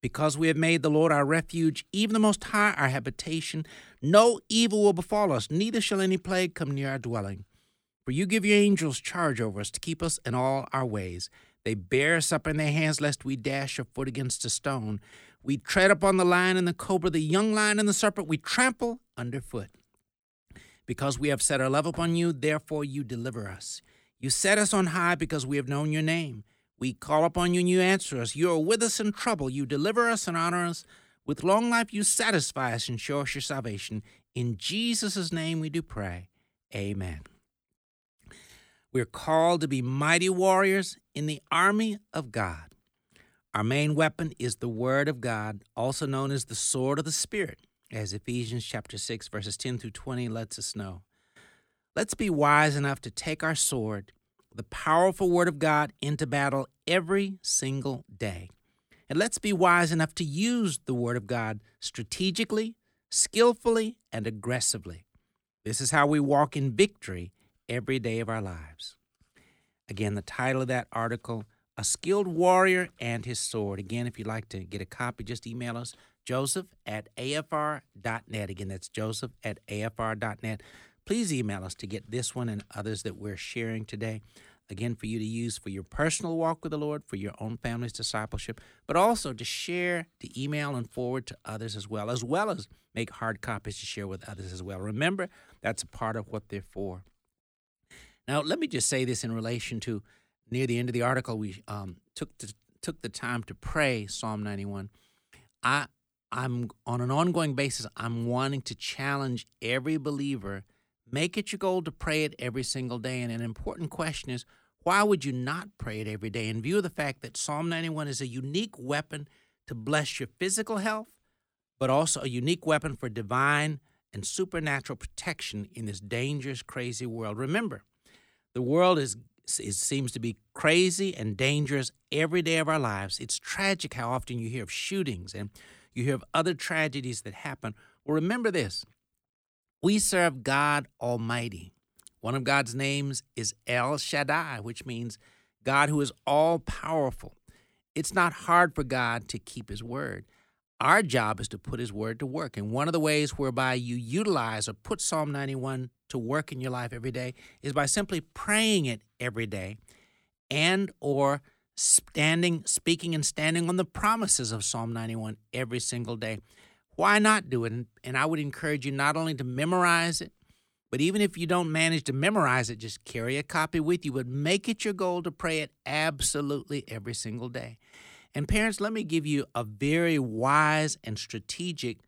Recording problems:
none

